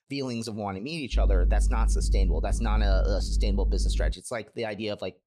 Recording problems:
low rumble; noticeable; from 1 to 4 s; 15 dB below the speech

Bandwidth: 14 kHz